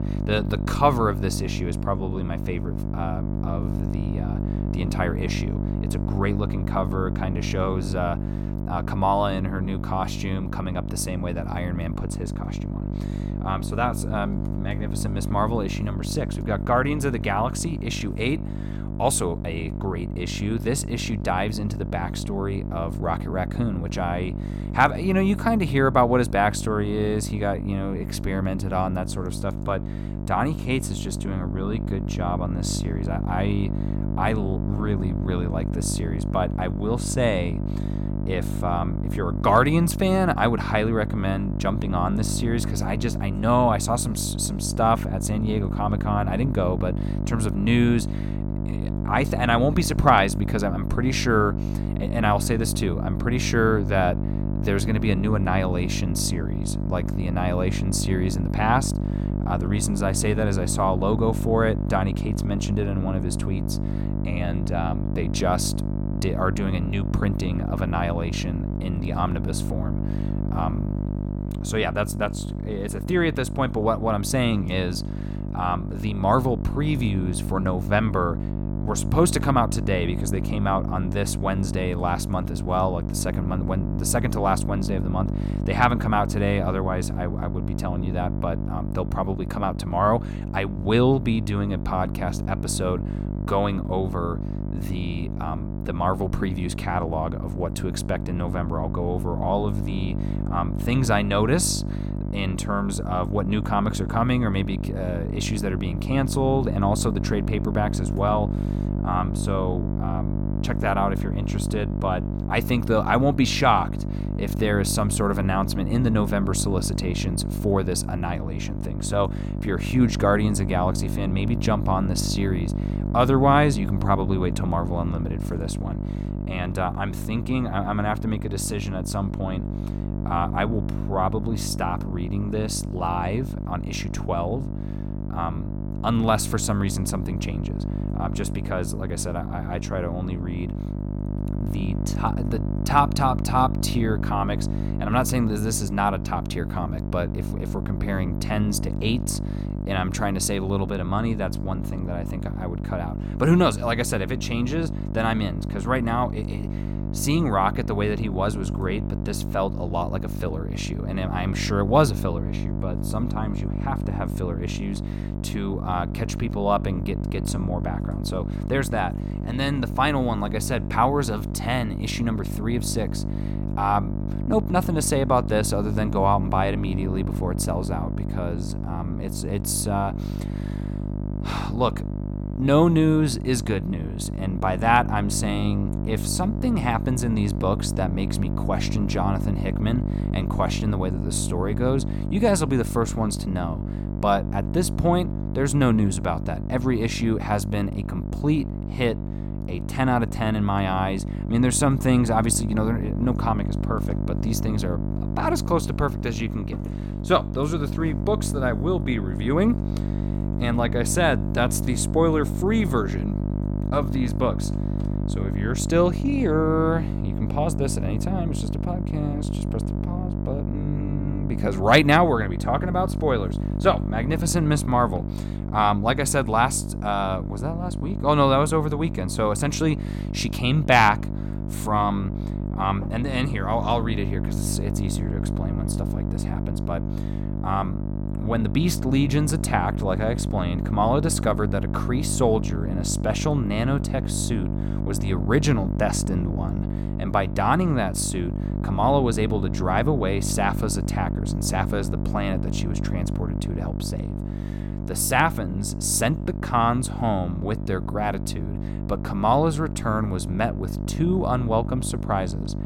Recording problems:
electrical hum; noticeable; throughout; 50 Hz, 10 dB below the speech

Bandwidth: 16.5 kHz